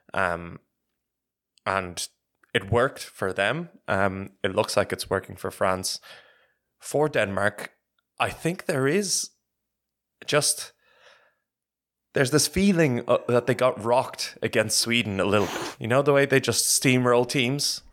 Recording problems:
animal sounds; very faint; from 13 s on; 15 dB below the speech

